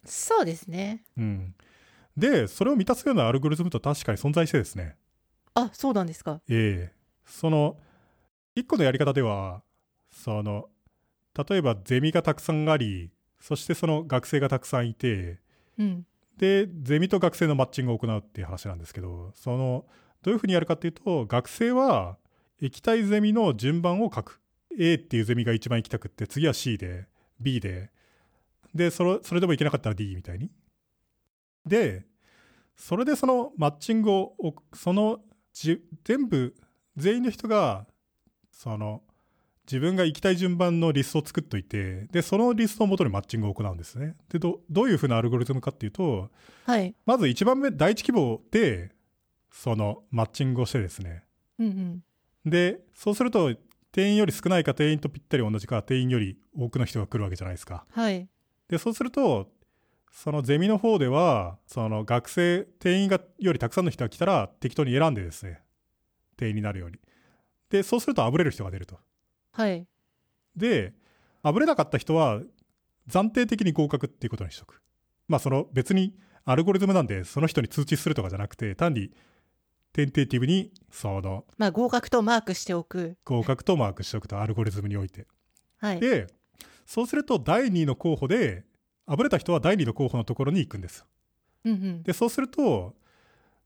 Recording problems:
none

